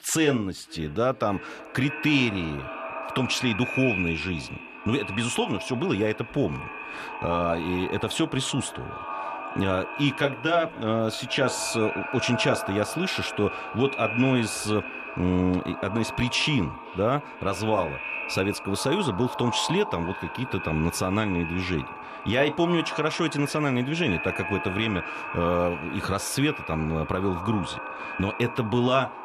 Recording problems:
echo of what is said; strong; throughout; 510 ms later, 7 dB below the speech

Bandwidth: 14 kHz